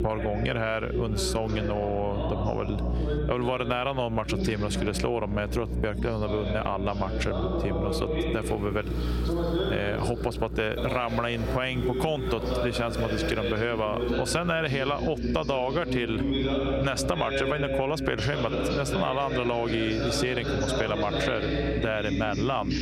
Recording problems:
squashed, flat; heavily, background pumping
voice in the background; loud; throughout; 3 dB below the speech
electrical hum; noticeable; throughout; 60 Hz, 20 dB below the speech
traffic noise; faint; from 8.5 s on; 20 dB below the speech

